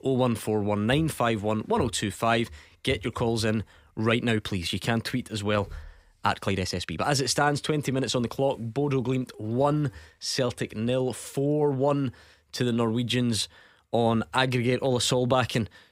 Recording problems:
uneven, jittery; strongly; from 4 to 14 s

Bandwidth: 15.5 kHz